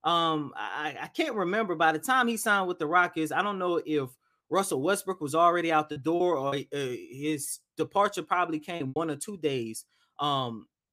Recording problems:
choppy; occasionally; at 6 s and at 9 s; 3% of the speech affected

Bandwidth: 15 kHz